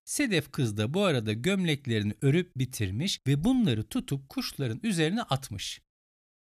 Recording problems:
none

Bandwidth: 14.5 kHz